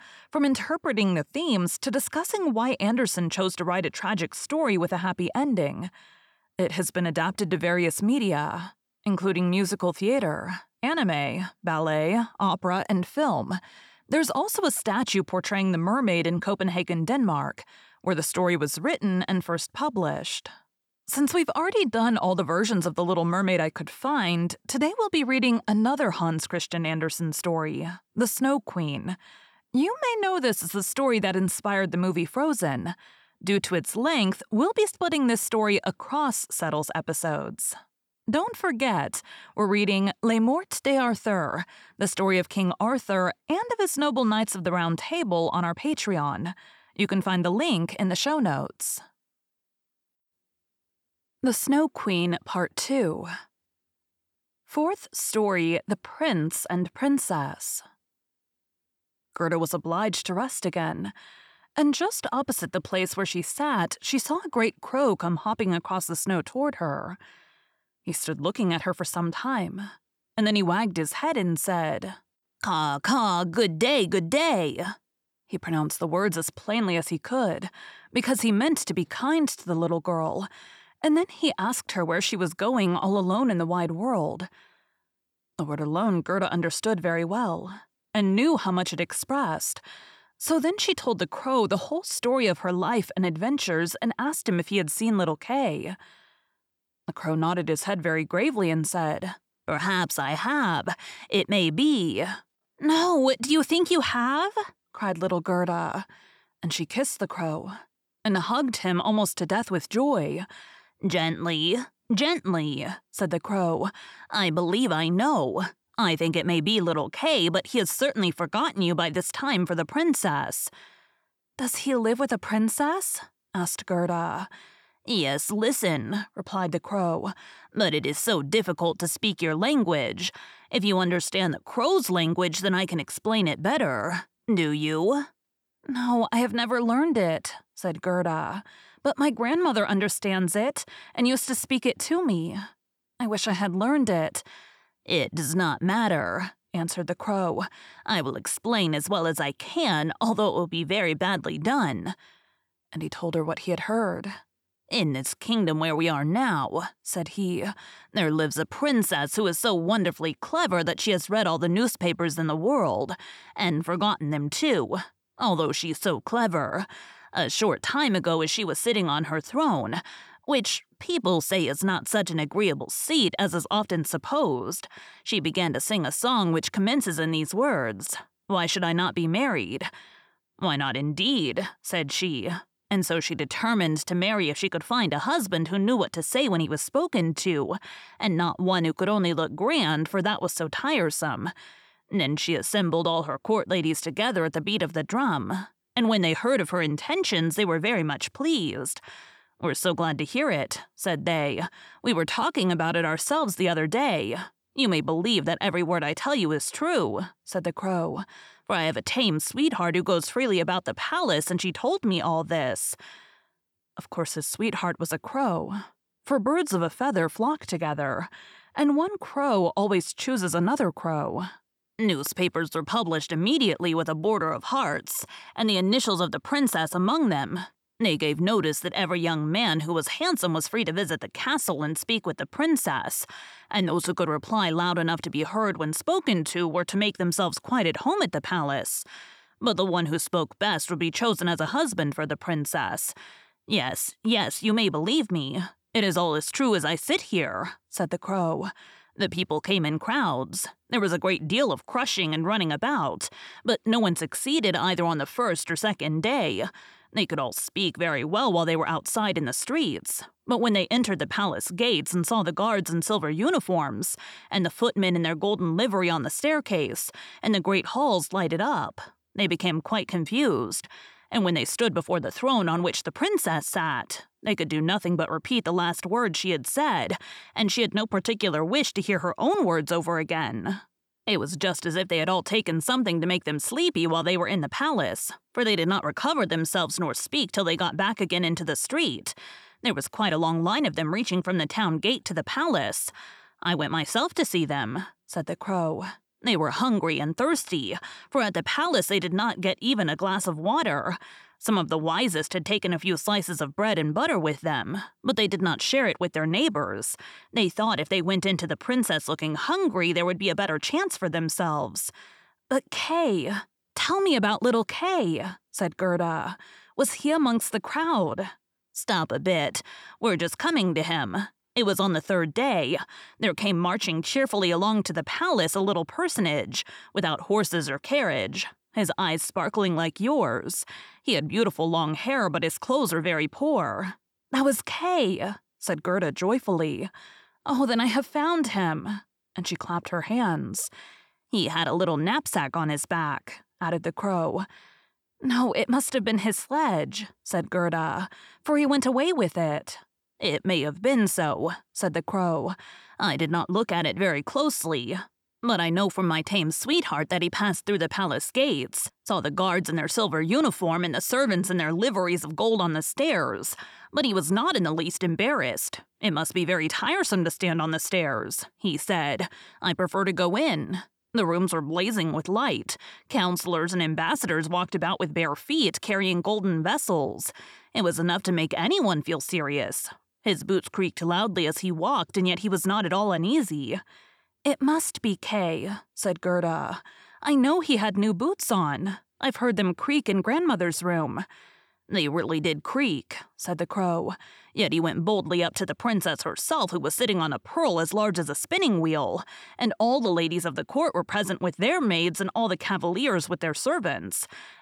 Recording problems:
none

